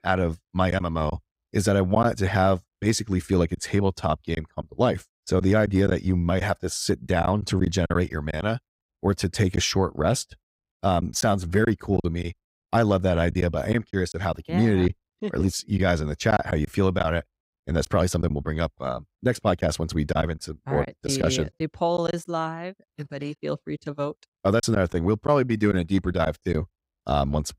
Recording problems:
choppy; occasionally; 4% of the speech affected

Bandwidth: 15.5 kHz